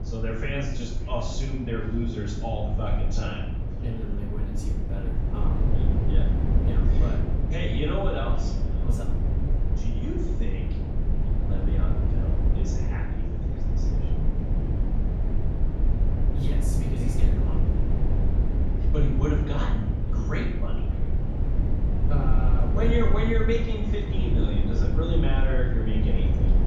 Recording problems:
off-mic speech; far
room echo; noticeable; dies away in 0.7 s
echo of what is said; faint; throughout; 580 ms later, 25 dB below the speech
low rumble; loud; throughout; 4 dB below the speech

